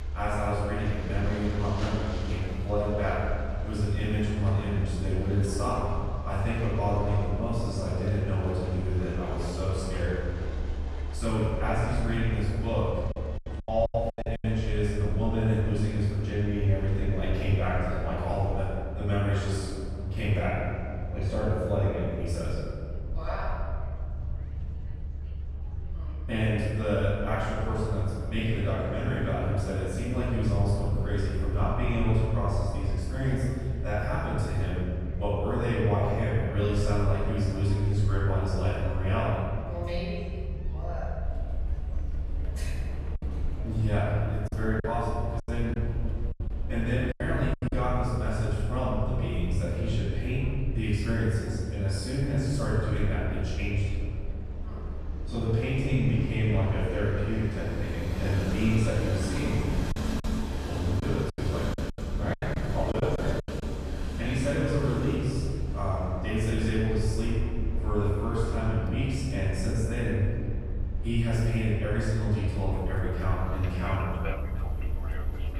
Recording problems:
room echo; strong; dies away in 1.9 s
off-mic speech; far
train or aircraft noise; noticeable; throughout; 15 dB below the speech
murmuring crowd; faint; throughout; 30 dB below the speech
low rumble; faint; throughout; 20 dB below the speech
choppy; very; at 14 s, from 44 to 48 s and from 1:01 to 1:04; 17% of the speech affected

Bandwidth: 15 kHz